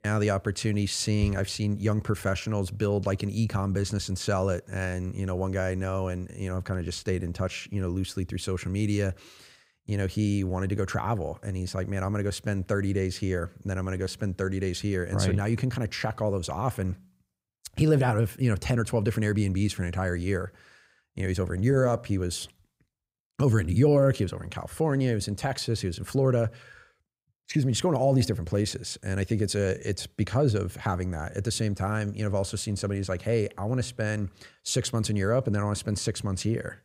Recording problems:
none

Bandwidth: 15.5 kHz